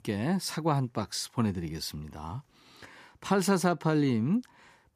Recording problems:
none

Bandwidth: 14.5 kHz